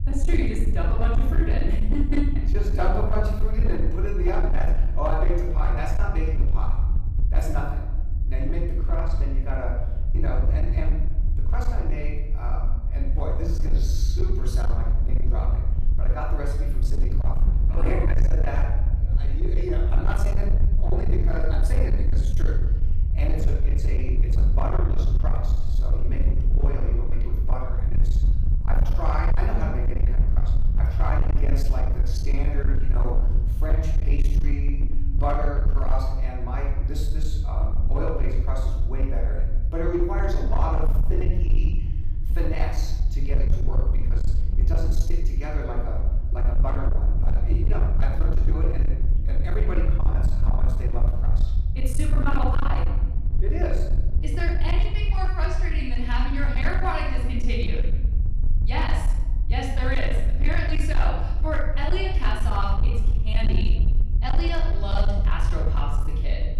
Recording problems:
off-mic speech; far
room echo; noticeable; dies away in 0.9 s
distortion; slight; 17% of the sound clipped
low rumble; loud; throughout; 8 dB below the speech

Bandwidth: 15 kHz